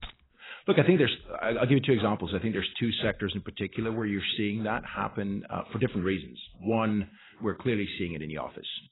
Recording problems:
garbled, watery; badly; nothing above 4 kHz
jangling keys; faint; at the start; peak 15 dB below the speech

